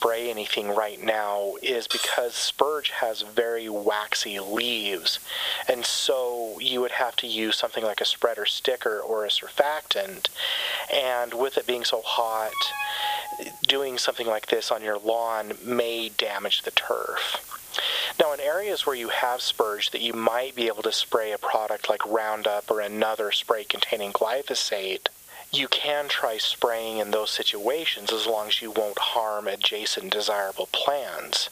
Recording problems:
thin; very; fading below 500 Hz
squashed, flat; heavily
muffled; slightly; fading above 3 kHz
hiss; noticeable; throughout; 15 dB below the speech
clattering dishes; noticeable; at 2 s; peak 1 dB below the speech
alarm; noticeable; at 12 s; peak 3 dB below the speech

